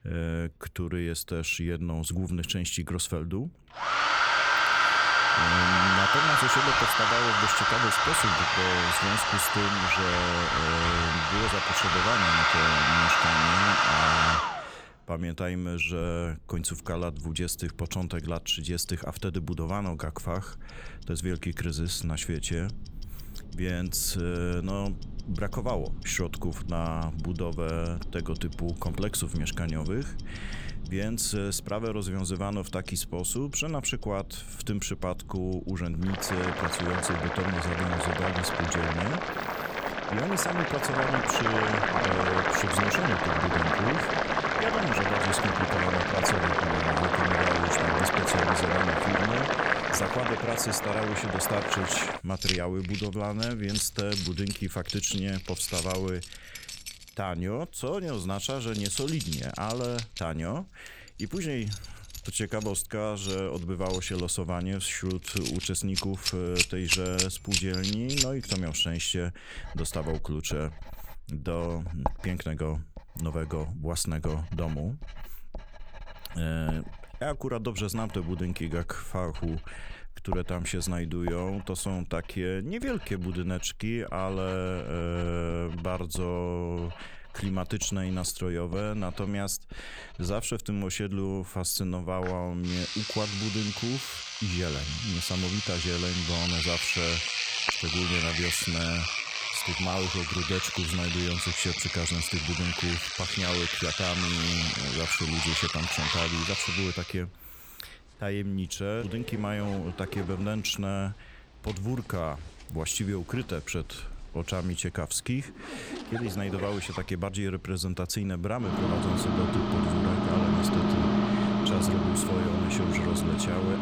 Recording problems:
household noises; very loud; throughout; 5 dB above the speech

